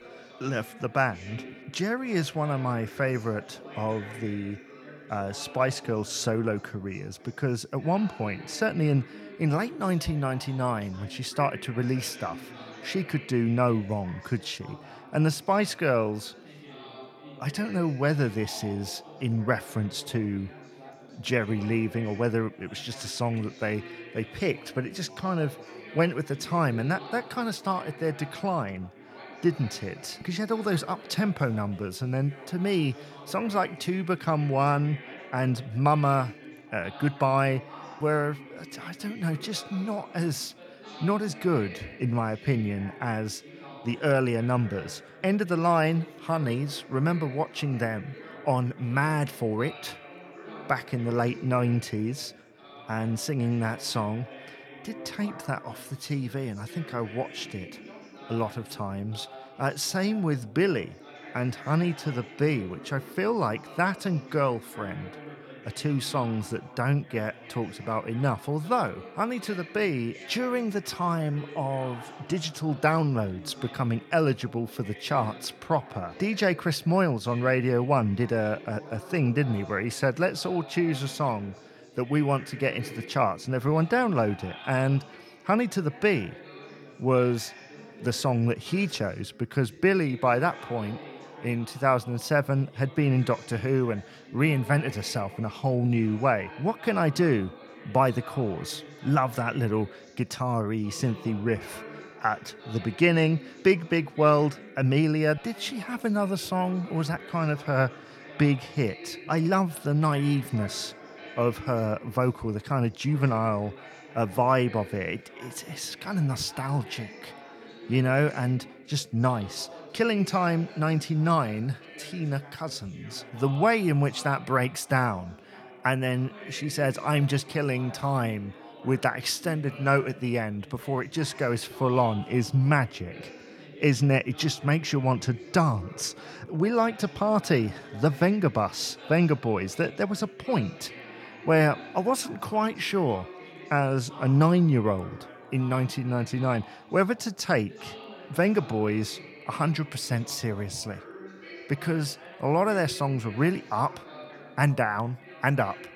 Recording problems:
background chatter; noticeable; throughout; 4 voices, 15 dB below the speech

